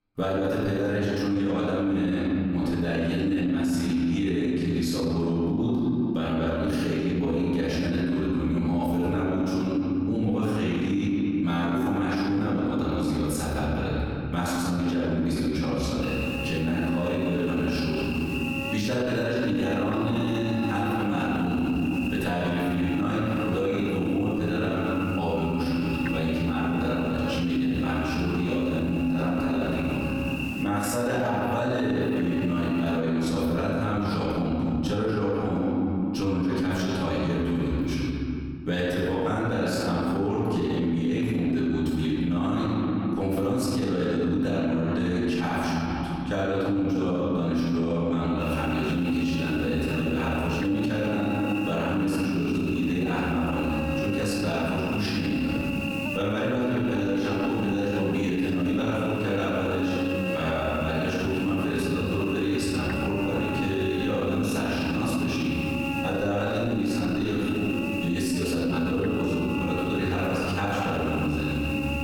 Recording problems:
room echo; strong; dies away in 2.1 s
off-mic speech; far
squashed, flat; somewhat
electrical hum; loud; from 16 to 33 s and from 48 s on; 50 Hz, 6 dB below the speech

